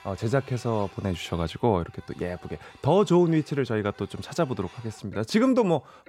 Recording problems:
household noises; faint; throughout; 25 dB below the speech

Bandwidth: 16 kHz